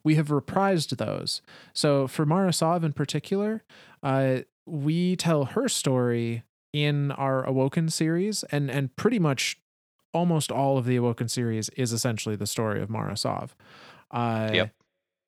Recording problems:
none

